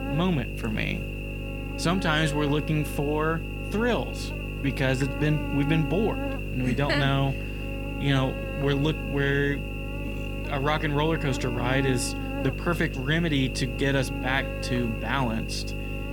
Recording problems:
electrical hum; loud; throughout; 50 Hz, 6 dB below the speech

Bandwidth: 18.5 kHz